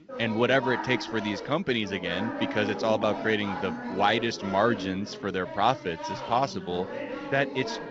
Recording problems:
garbled, watery; slightly; nothing above 6 kHz
background chatter; loud; throughout; 4 voices, 8 dB below the speech

